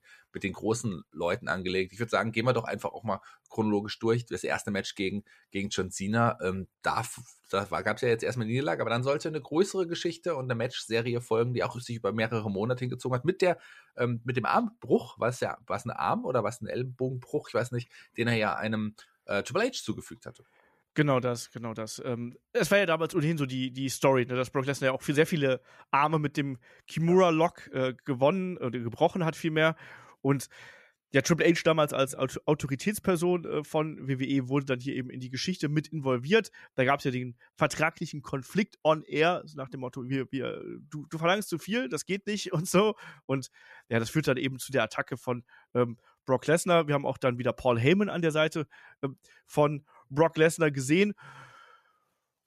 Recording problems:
none

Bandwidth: 14.5 kHz